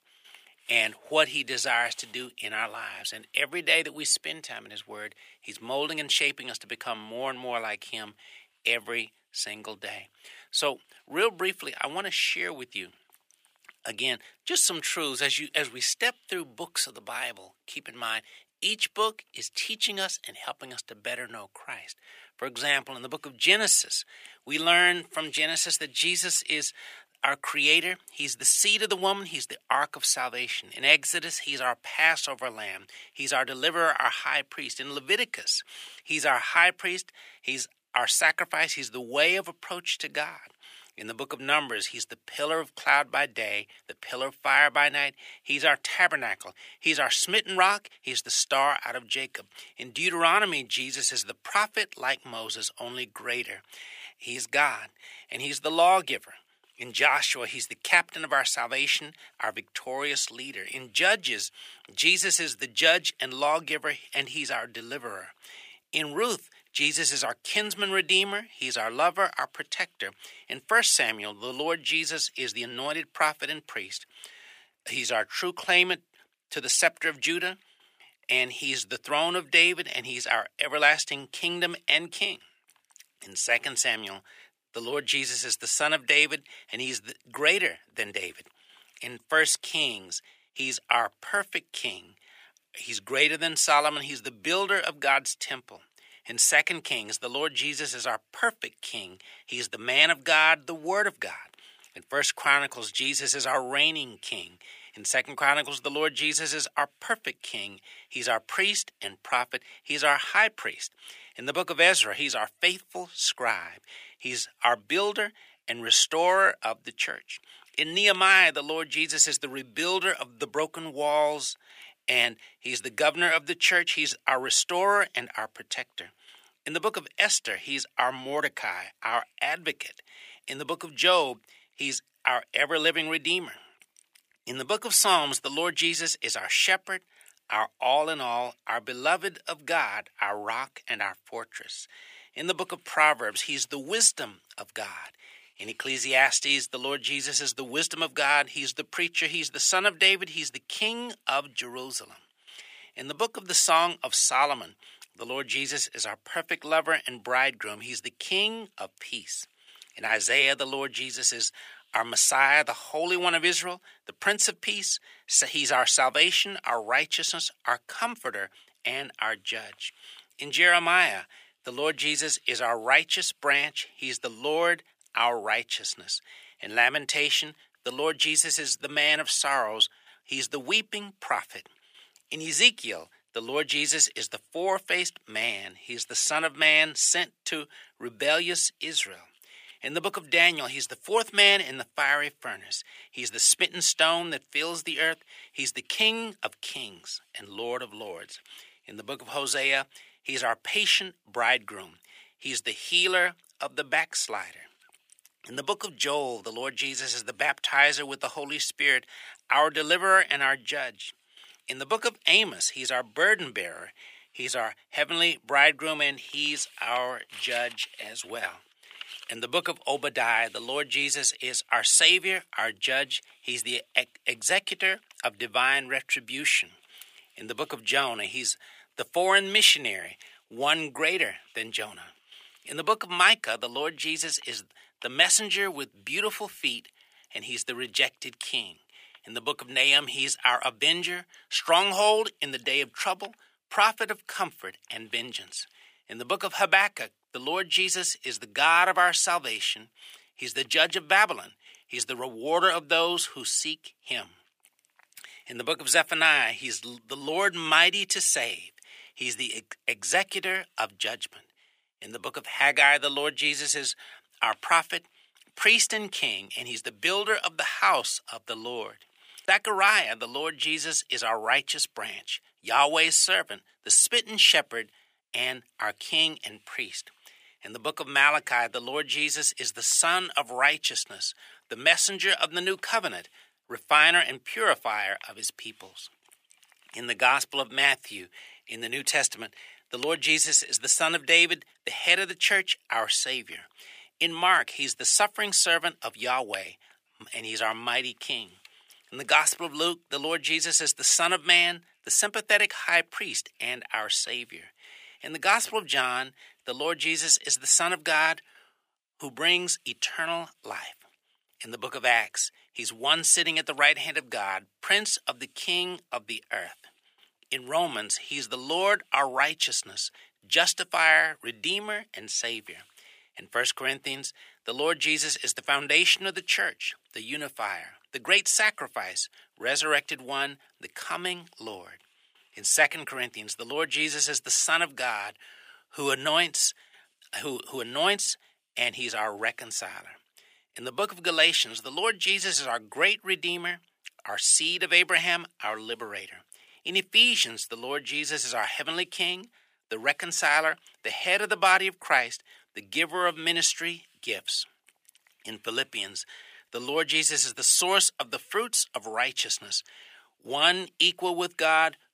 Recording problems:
thin; very; fading below 550 Hz

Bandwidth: 15 kHz